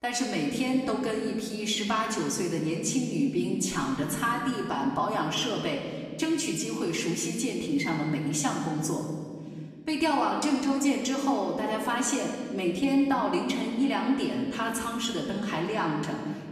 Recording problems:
off-mic speech; far
room echo; noticeable; dies away in 1.9 s

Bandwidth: 15 kHz